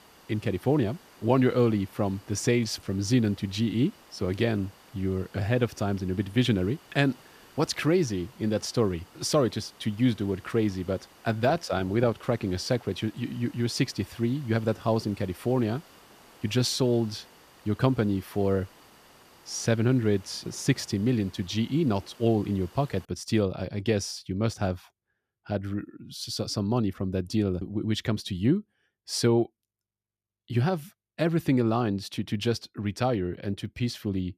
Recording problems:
hiss; faint; until 23 s; 25 dB below the speech

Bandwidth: 14.5 kHz